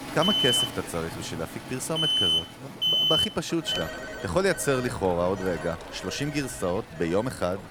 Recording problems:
echo of what is said; faint; throughout; 390 ms later, 20 dB below the speech
alarms or sirens; very loud; throughout; 5 dB above the speech
rain or running water; noticeable; throughout; 15 dB below the speech

